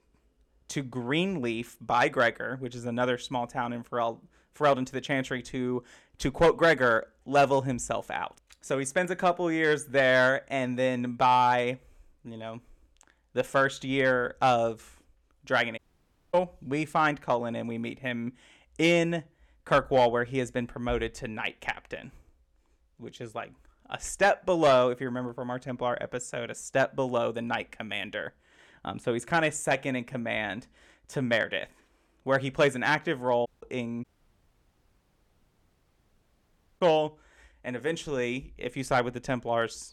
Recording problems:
audio cutting out; at 16 s for 0.5 s, at 33 s and at 34 s for 3 s

